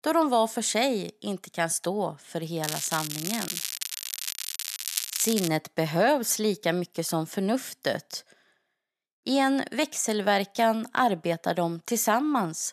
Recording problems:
crackling; loud; from 2.5 to 5.5 s; 4 dB below the speech

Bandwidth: 14 kHz